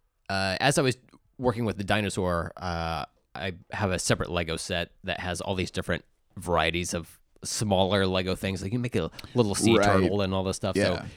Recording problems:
none

